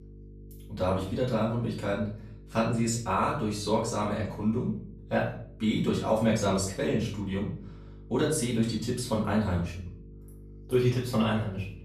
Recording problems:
off-mic speech; far
room echo; noticeable; dies away in 0.5 s
electrical hum; faint; throughout; 50 Hz, 25 dB below the speech

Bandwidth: 14.5 kHz